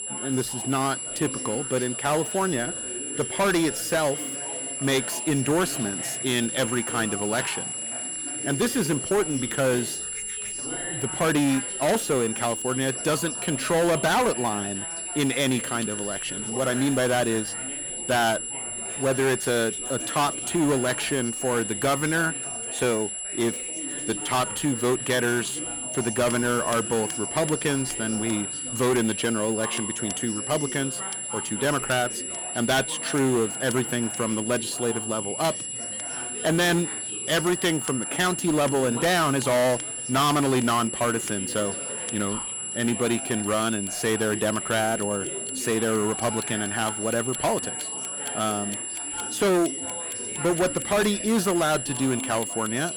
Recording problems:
distortion; heavy; 11% of the sound clipped
high-pitched whine; loud; throughout; 10 kHz, 4 dB below the speech
chatter from many people; noticeable; throughout; 15 dB below the speech
household noises; faint; throughout; 20 dB below the speech

